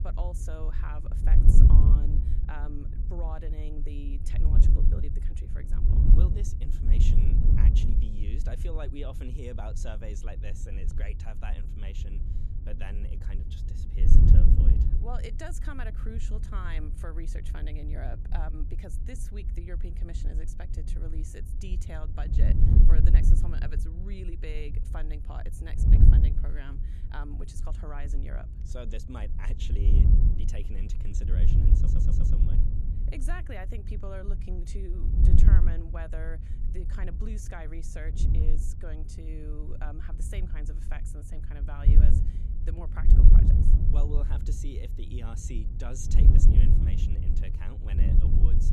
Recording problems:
wind noise on the microphone; heavy; 1 dB above the speech
audio stuttering; at 32 s

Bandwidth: 14 kHz